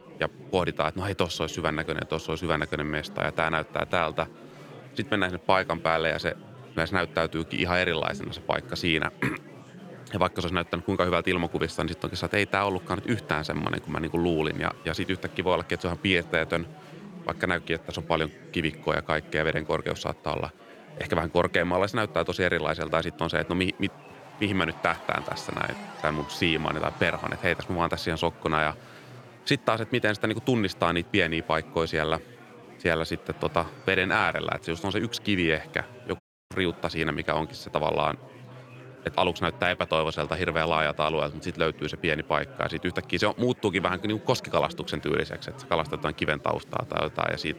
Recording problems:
murmuring crowd; noticeable; throughout; 20 dB below the speech
audio cutting out; at 36 s

